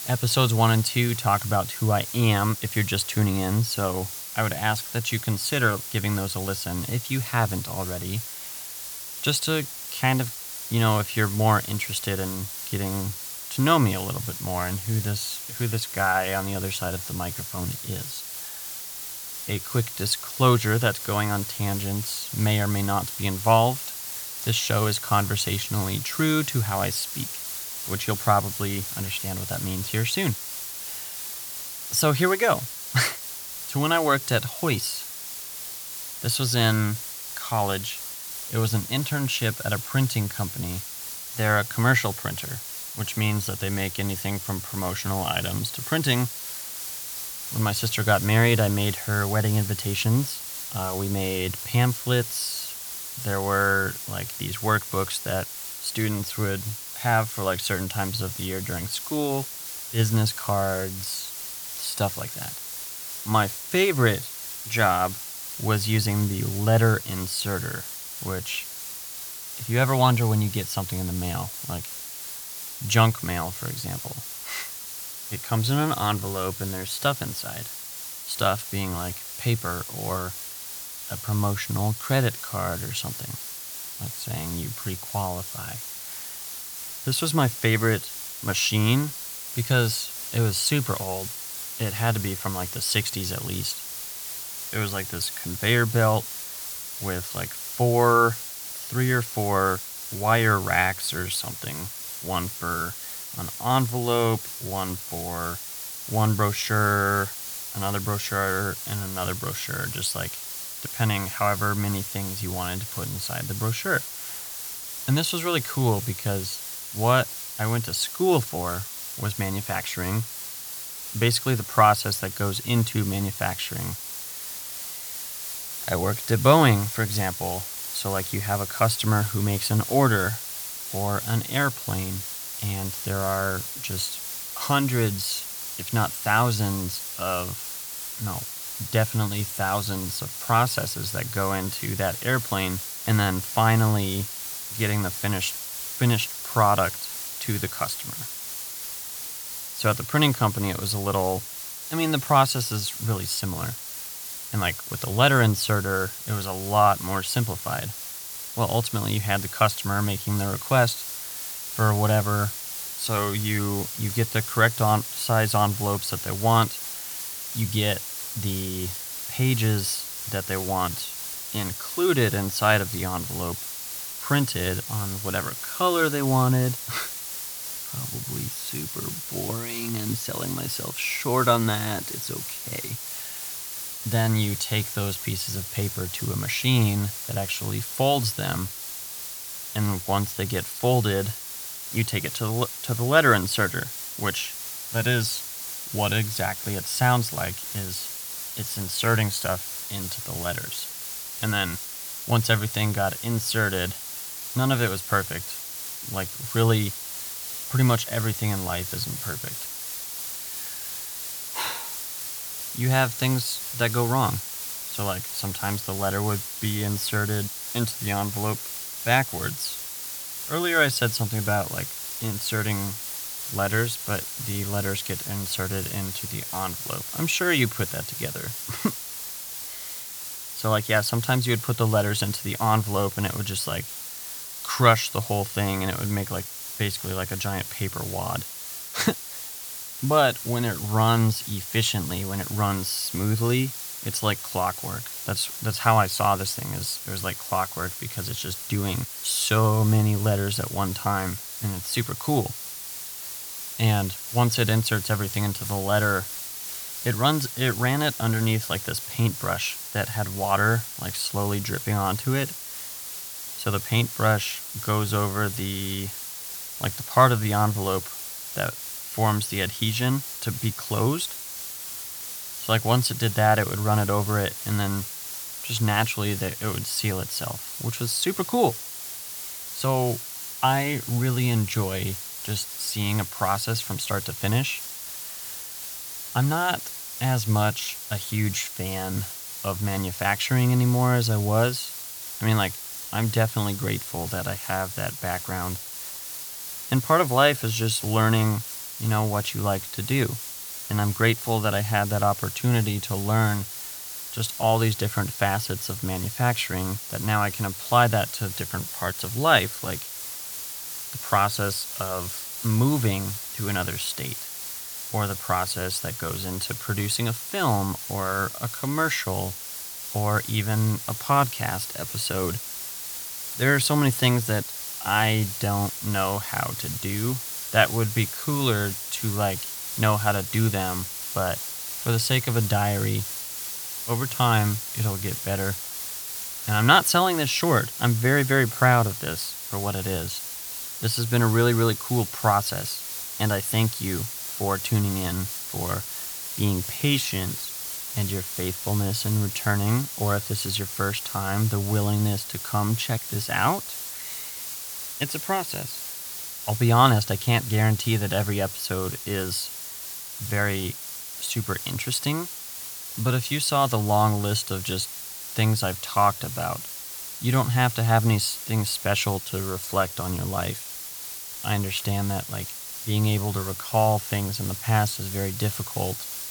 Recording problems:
hiss; loud; throughout; 7 dB below the speech

